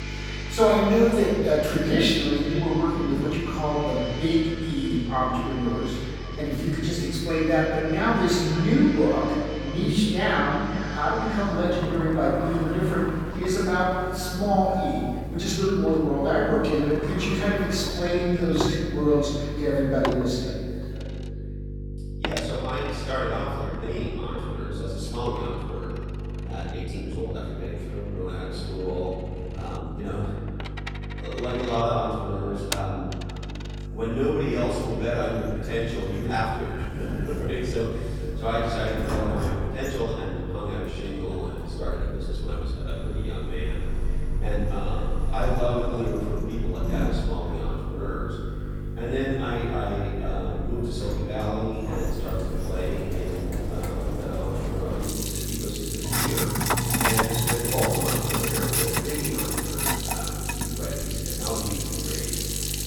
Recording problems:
room echo; strong; dies away in 1.3 s
off-mic speech; far
echo of what is said; noticeable; throughout; 510 ms later, 15 dB below the speech
household noises; loud; throughout; 5 dB below the speech
electrical hum; noticeable; throughout; 50 Hz, 15 dB below the speech
uneven, jittery; strongly; from 1.5 s to 1:02

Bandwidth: 18 kHz